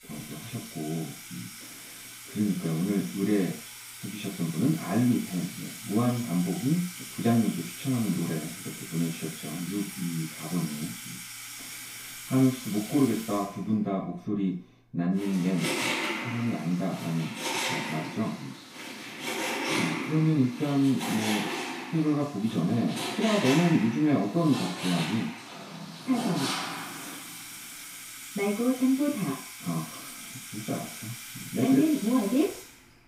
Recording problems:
off-mic speech; far
room echo; noticeable; dies away in 0.4 s
household noises; loud; throughout; 7 dB below the speech

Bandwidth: 15.5 kHz